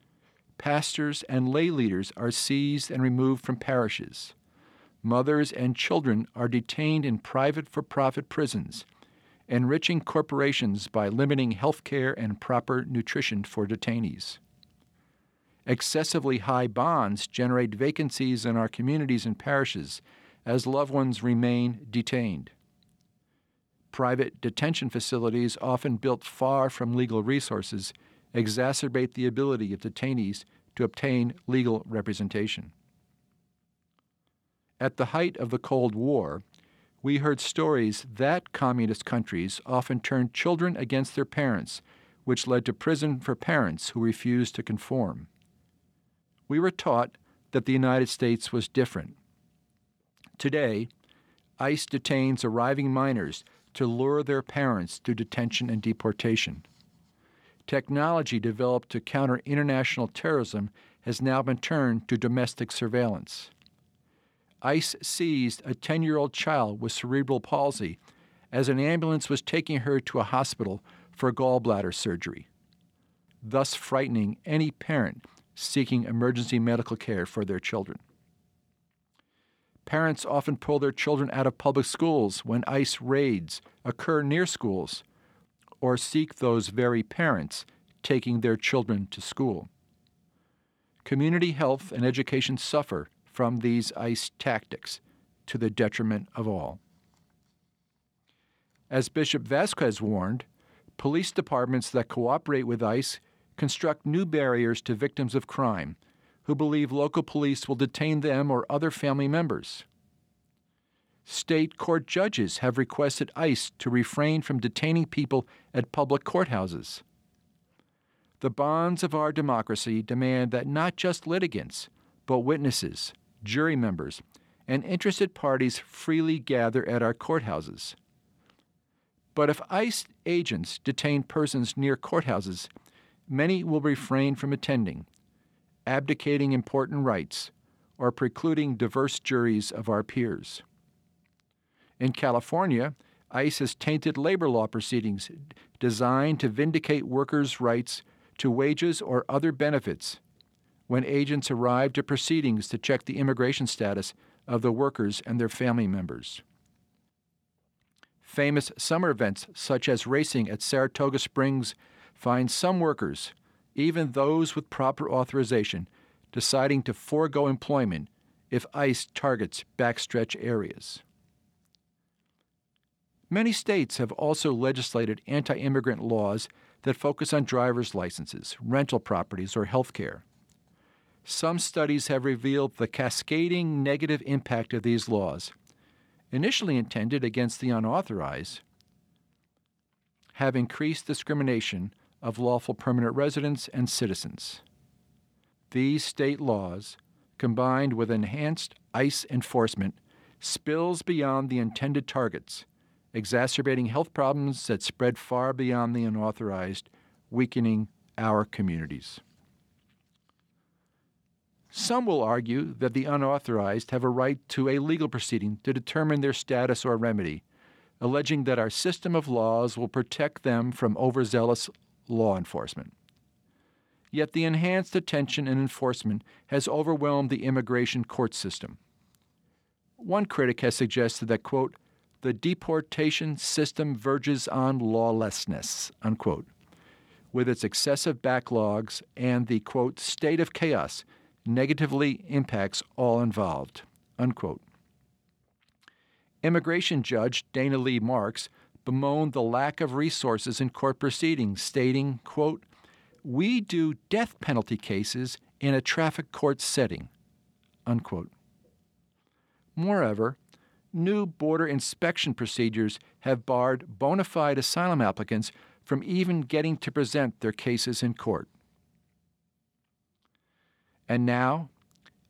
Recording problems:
none

